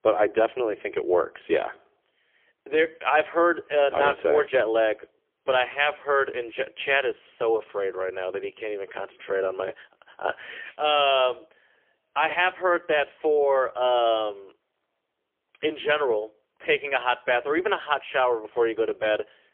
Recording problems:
phone-call audio; poor line; nothing above 3.5 kHz

